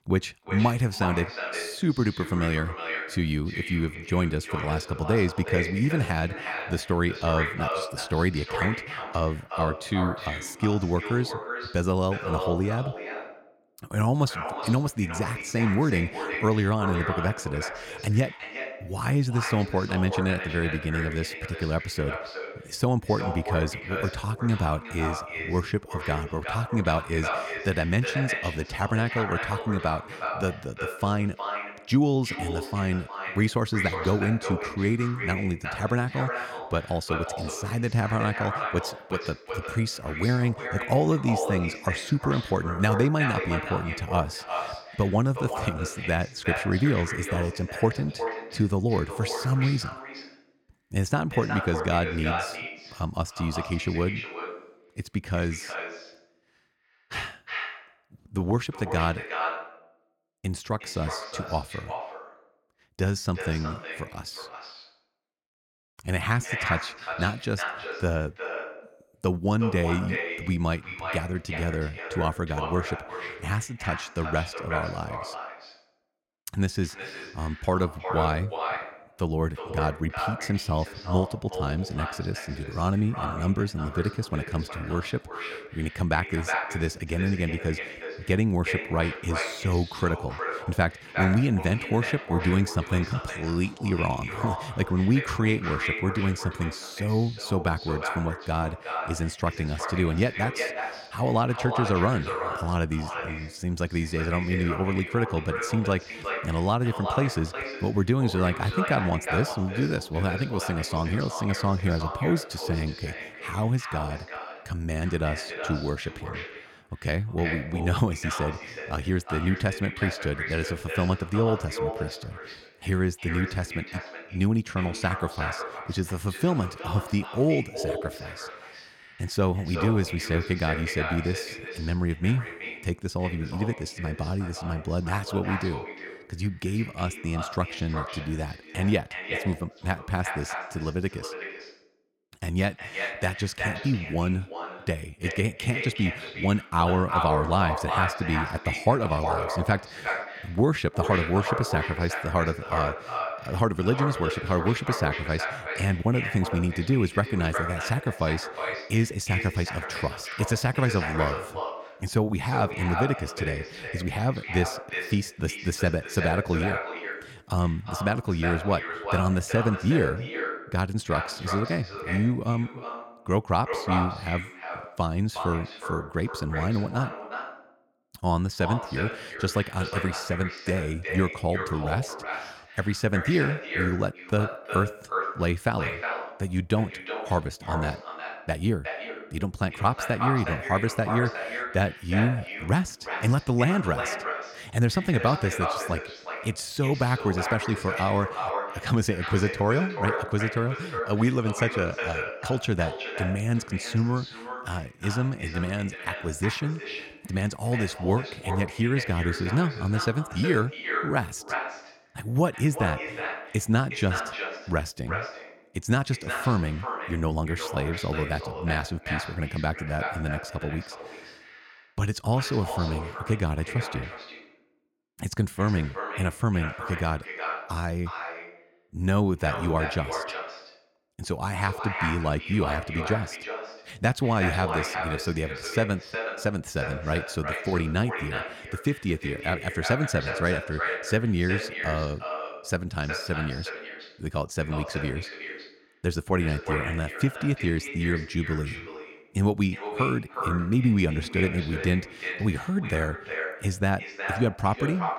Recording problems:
echo of what is said; strong; throughout; 360 ms later, 6 dB below the speech

